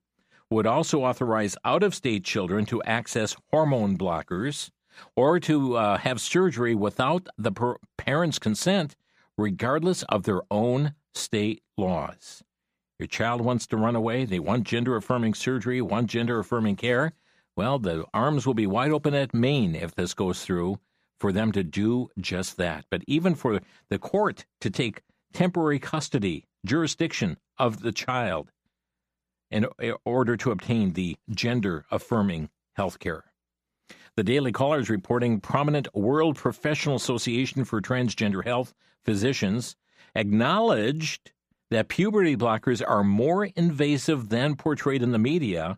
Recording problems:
none

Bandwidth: 15 kHz